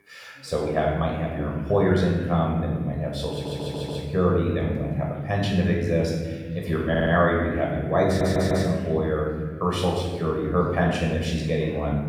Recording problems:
off-mic speech; far
room echo; noticeable; dies away in 1.5 s
background chatter; faint; throughout; 2 voices, 25 dB below the speech
audio stuttering; at 3.5 s, at 7 s and at 8 s

